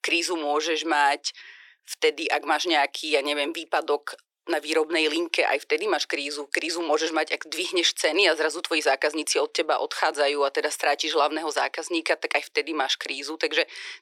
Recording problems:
thin; very; fading below 400 Hz

